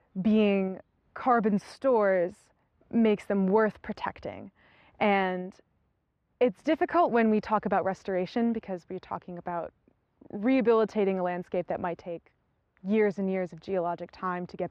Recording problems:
muffled; very; fading above 2 kHz

